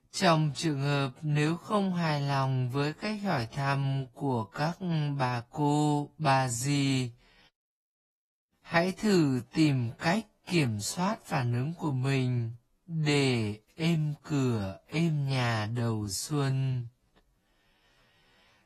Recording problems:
wrong speed, natural pitch; too slow; 0.5 times normal speed
garbled, watery; slightly; nothing above 12.5 kHz

